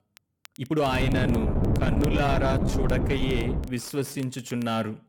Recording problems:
distortion; slight; 10 dB below the speech
crackle, like an old record; faint; 25 dB below the speech
wind noise on the microphone; faint; from 1 to 3.5 s; 4 dB below the speech
uneven, jittery; strongly; from 0.5 to 4.5 s

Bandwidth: 17 kHz